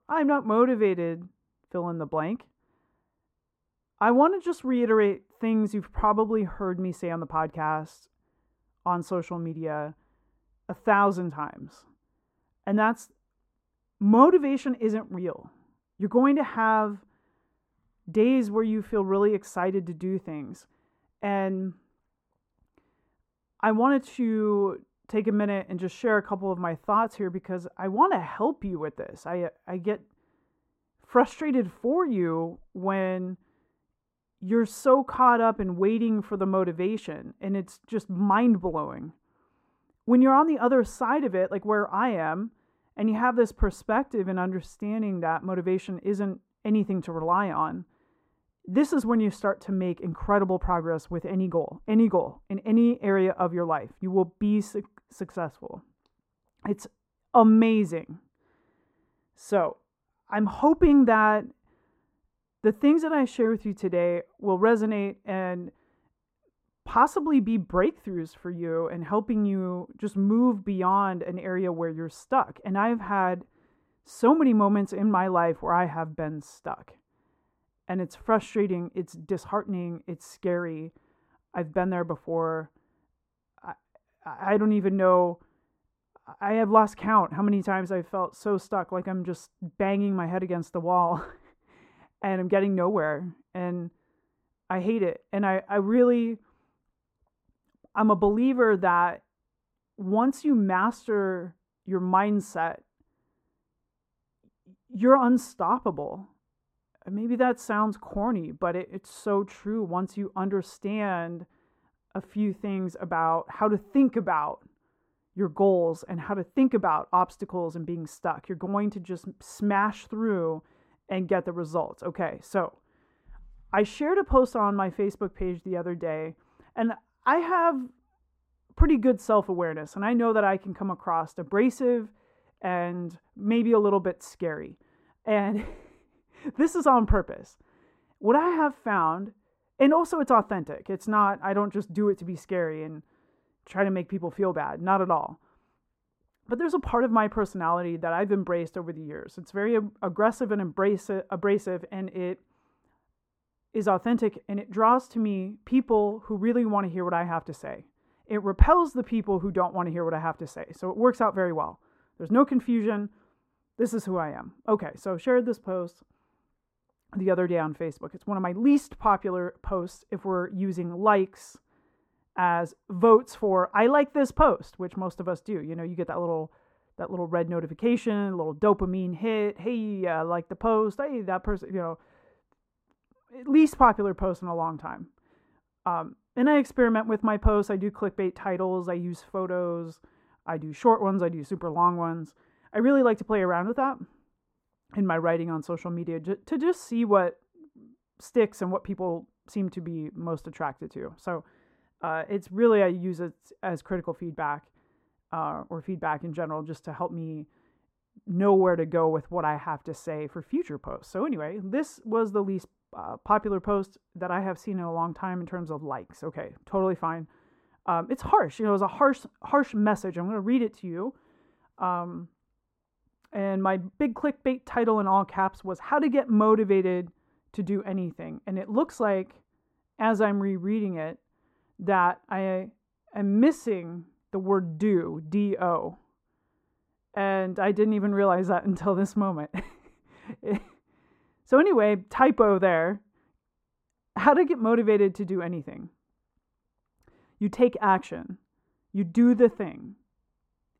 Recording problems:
muffled; very; fading above 2 kHz

